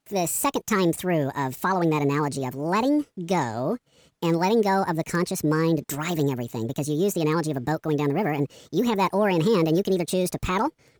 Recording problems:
wrong speed and pitch; too fast and too high; 1.6 times normal speed

